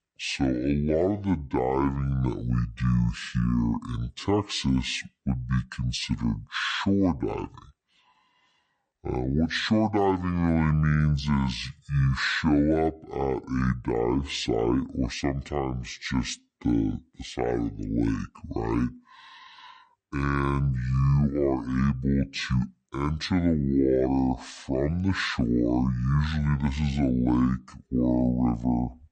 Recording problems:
wrong speed and pitch; too slow and too low; 0.6 times normal speed

